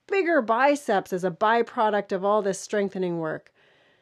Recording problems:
none

